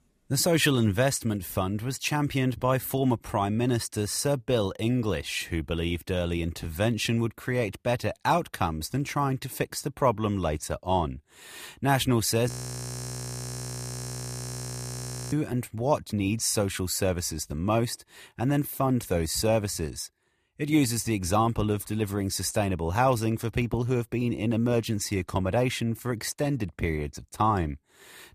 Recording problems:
audio freezing; at 12 s for 3 s

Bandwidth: 14.5 kHz